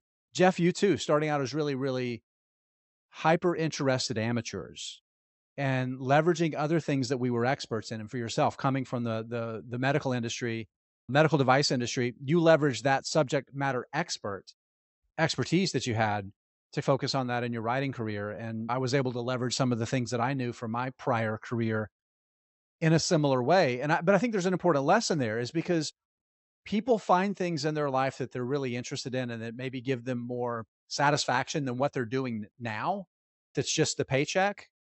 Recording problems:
high frequencies cut off; noticeable; nothing above 8 kHz

